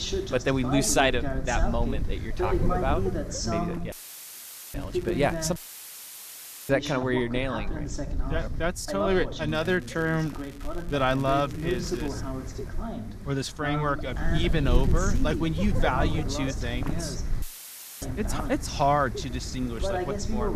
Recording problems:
voice in the background; loud; throughout; 6 dB below the speech
wind noise on the microphone; occasional gusts; 15 dB below the speech
crackling; faint; at 4.5 s, from 9.5 to 12 s and at 15 s; 20 dB below the speech
audio cutting out; filled with static; at 4 s for 1 s, at 5.5 s for 1 s and at 17 s for 0.5 s

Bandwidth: 14.5 kHz